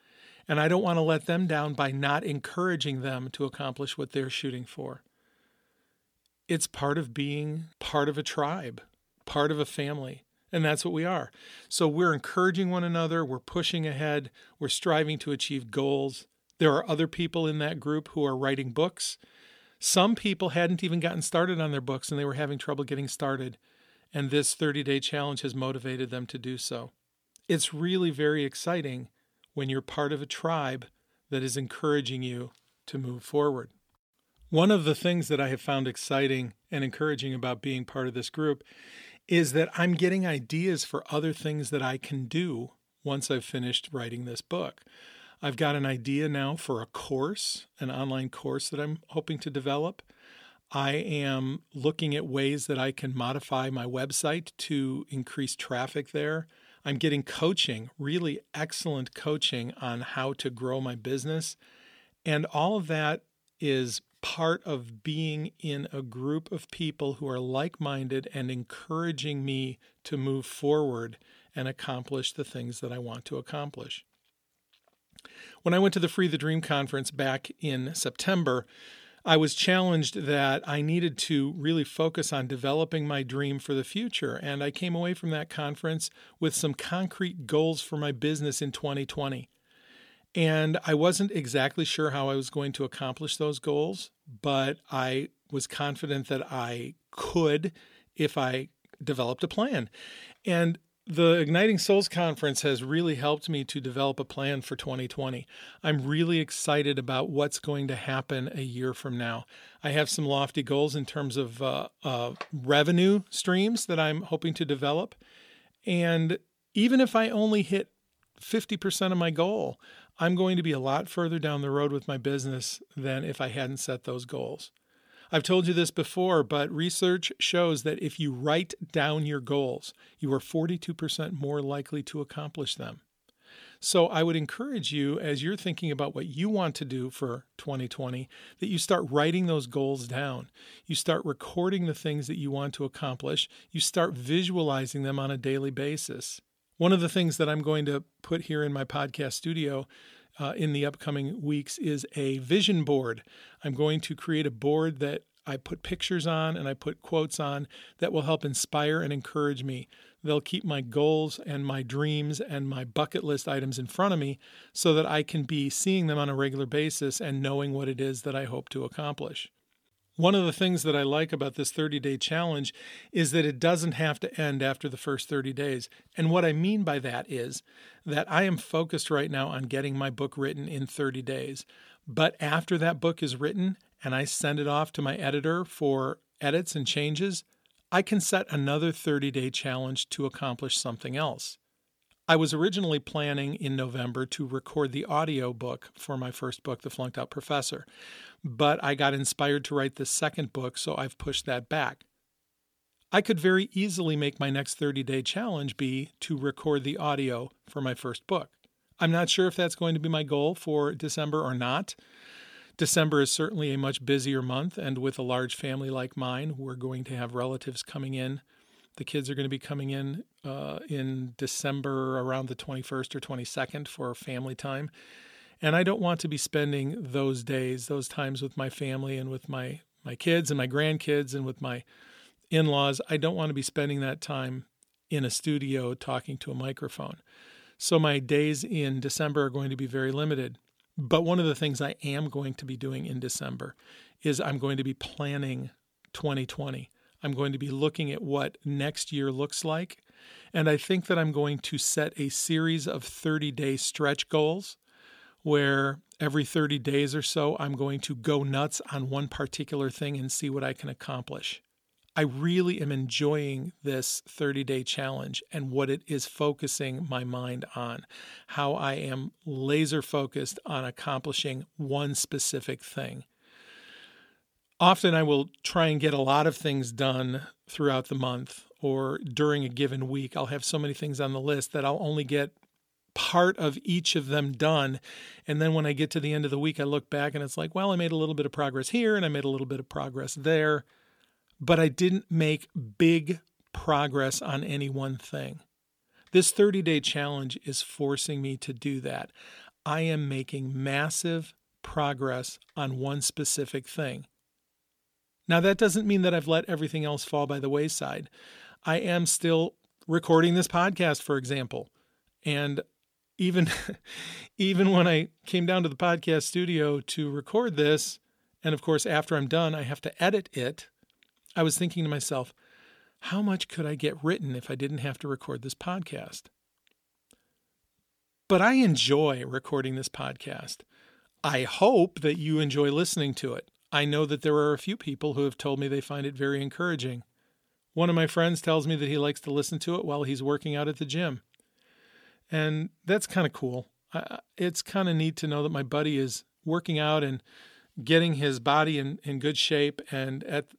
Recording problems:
none

